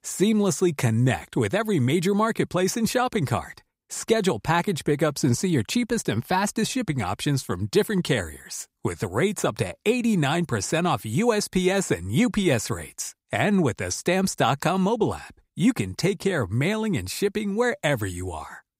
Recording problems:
none

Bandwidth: 15.5 kHz